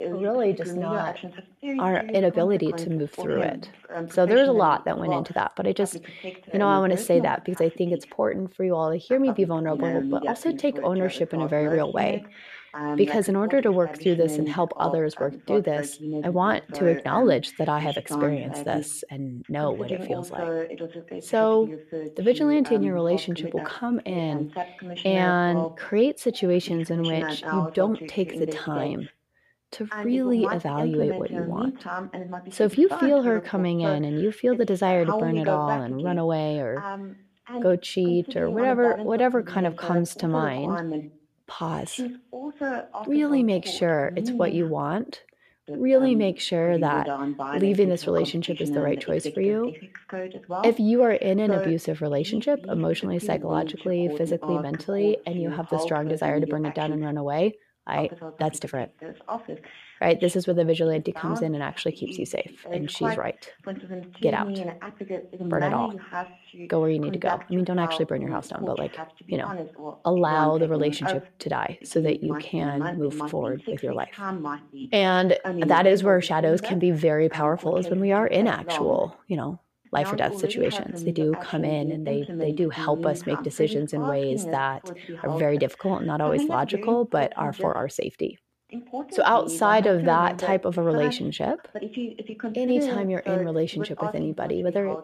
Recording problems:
voice in the background; loud; throughout; 8 dB below the speech

